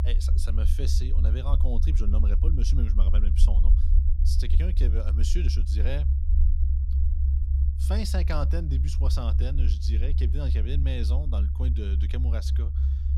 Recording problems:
low rumble; loud; throughout; 5 dB below the speech

